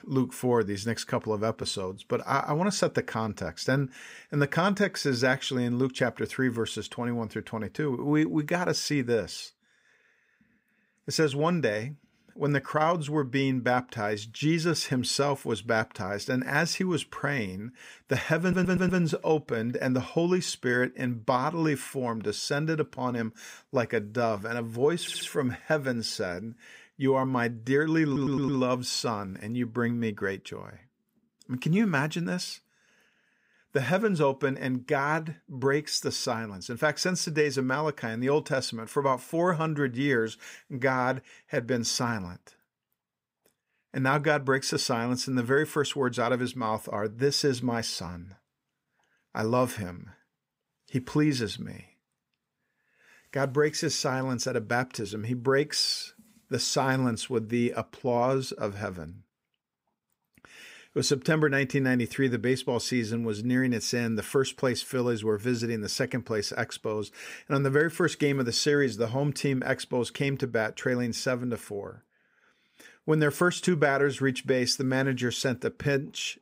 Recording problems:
audio stuttering; at 18 s, at 25 s and at 28 s

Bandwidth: 15.5 kHz